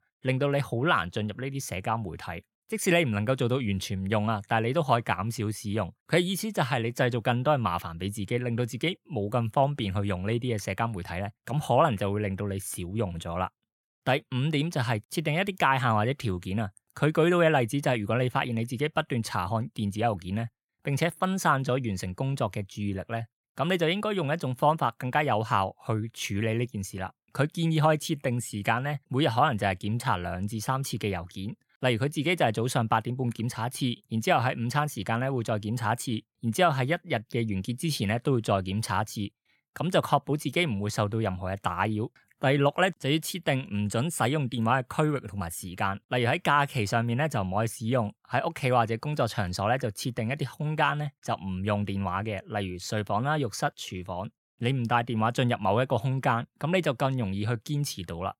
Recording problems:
none

